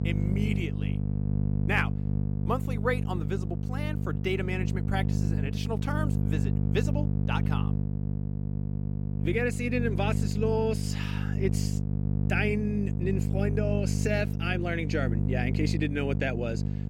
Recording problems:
electrical hum; loud; throughout; 50 Hz, 7 dB below the speech

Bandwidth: 16 kHz